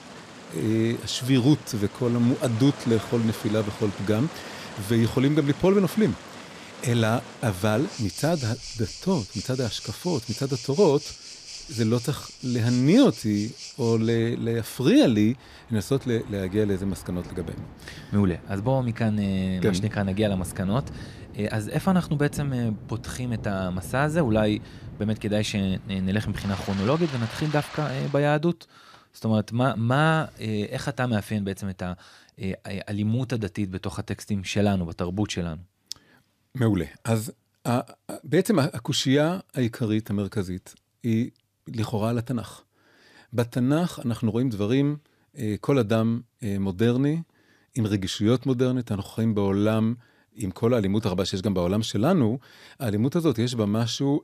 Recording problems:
rain or running water; noticeable; until 28 s; 15 dB below the speech

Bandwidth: 14.5 kHz